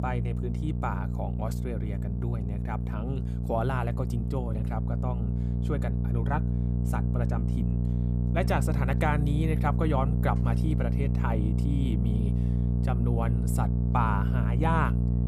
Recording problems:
electrical hum; loud; throughout; 60 Hz, 6 dB below the speech

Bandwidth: 15 kHz